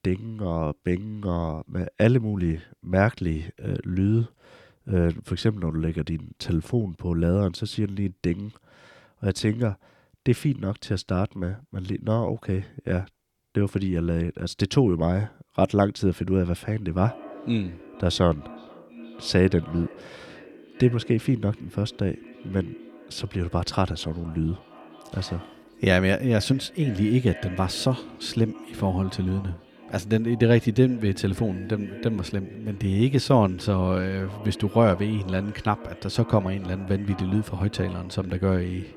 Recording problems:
echo of what is said; faint; from 17 s on; 460 ms later, 20 dB below the speech

